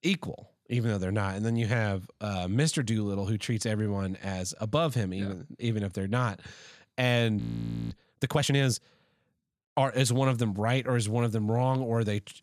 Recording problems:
audio freezing; at 7.5 s for 0.5 s

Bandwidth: 14 kHz